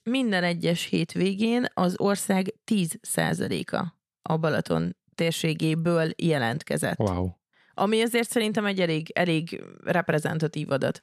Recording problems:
none

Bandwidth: 13.5 kHz